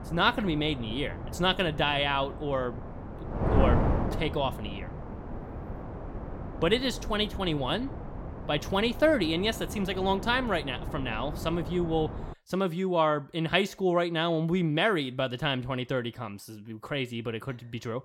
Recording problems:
wind noise on the microphone; occasional gusts; until 12 s; 10 dB below the speech

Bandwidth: 16.5 kHz